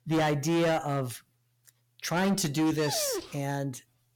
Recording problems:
distortion; heavy; 12% of the sound clipped
dog barking; noticeable; at 2.5 s; peak 5 dB below the speech

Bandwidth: 17 kHz